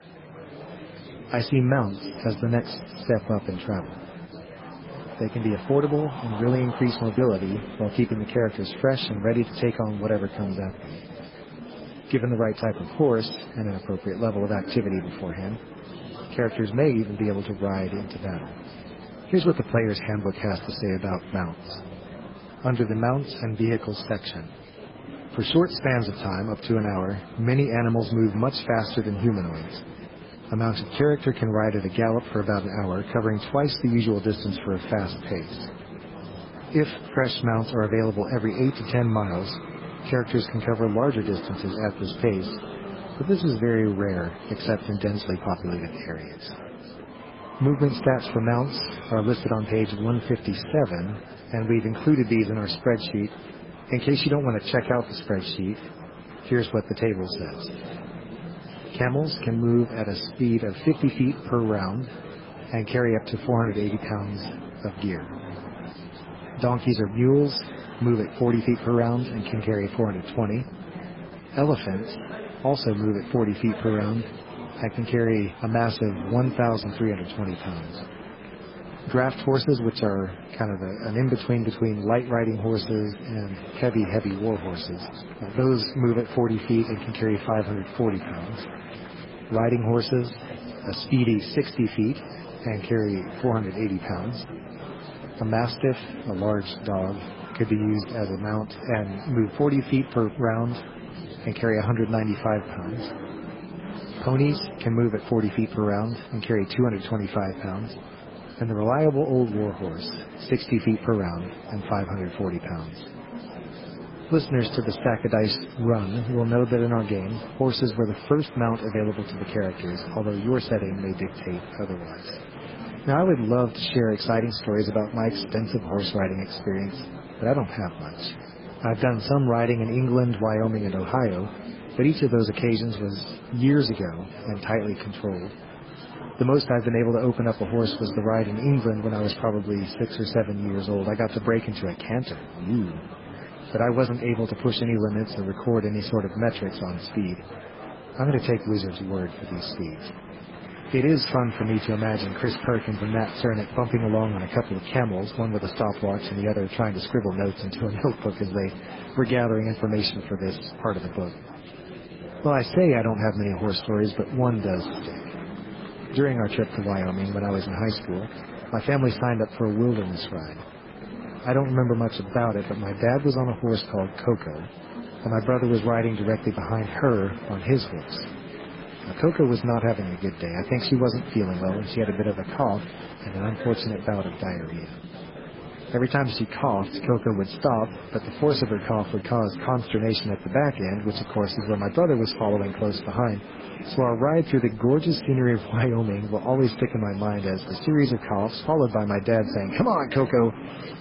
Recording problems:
garbled, watery; badly; nothing above 5 kHz
murmuring crowd; noticeable; throughout; 15 dB below the speech

